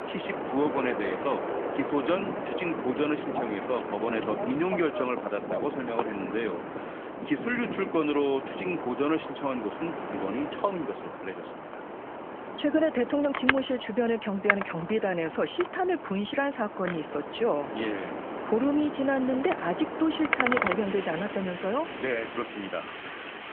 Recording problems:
phone-call audio; nothing above 3.5 kHz
wind in the background; loud; throughout; 4 dB below the speech

